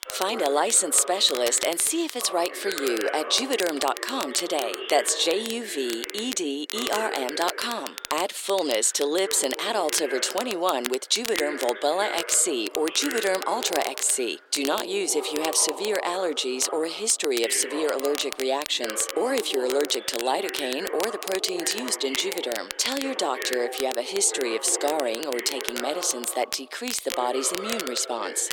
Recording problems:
thin; somewhat; fading below 350 Hz
voice in the background; noticeable; throughout; 10 dB below the speech
crackle, like an old record; noticeable; 10 dB below the speech

